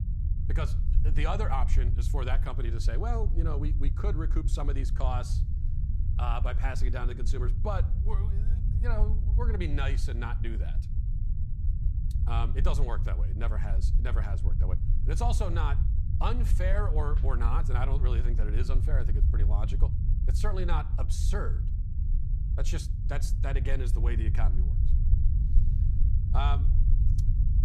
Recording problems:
low rumble; loud; throughout; 9 dB below the speech

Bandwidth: 15 kHz